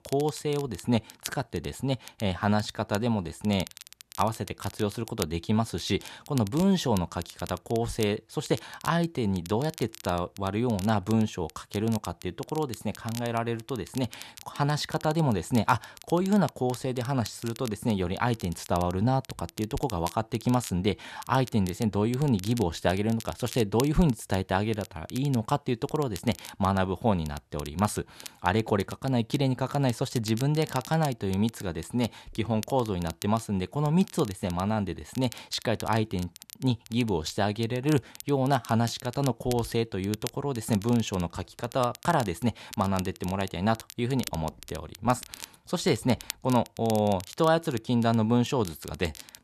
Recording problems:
crackle, like an old record; noticeable; 15 dB below the speech

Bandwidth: 13.5 kHz